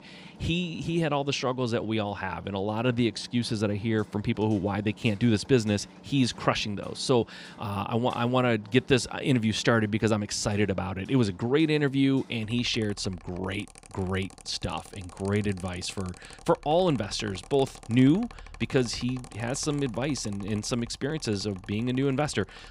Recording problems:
machinery noise; faint; throughout; 20 dB below the speech

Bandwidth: 15.5 kHz